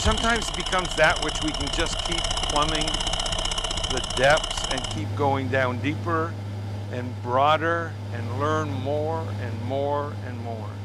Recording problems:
machinery noise; loud; throughout; 2 dB below the speech
abrupt cut into speech; at the start

